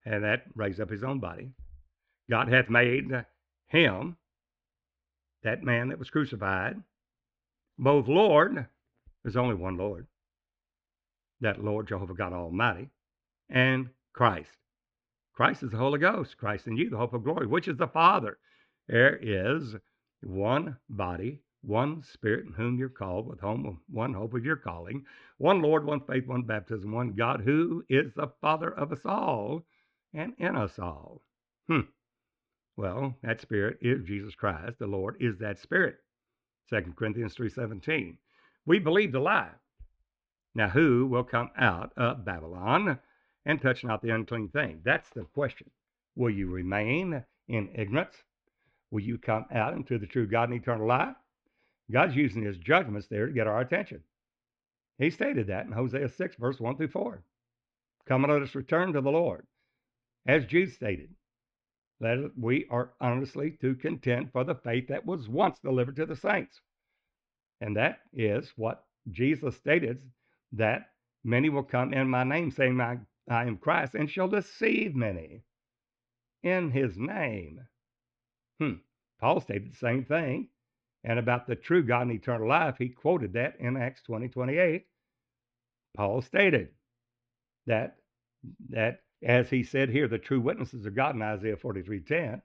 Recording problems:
muffled; very; fading above 3.5 kHz

